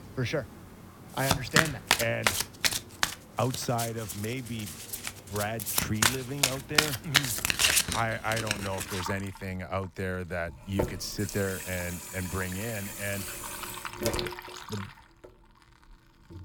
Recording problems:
household noises; very loud; throughout; 4 dB above the speech

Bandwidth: 17 kHz